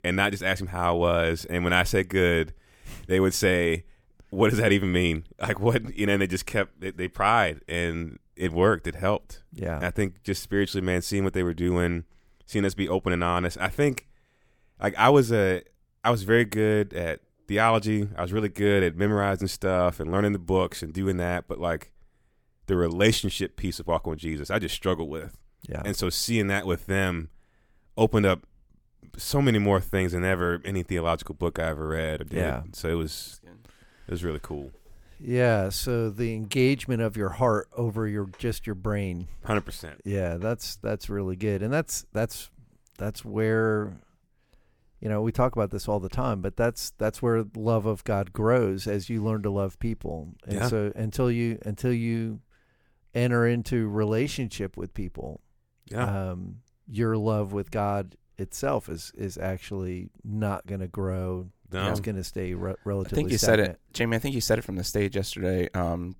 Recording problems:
none

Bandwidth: 18 kHz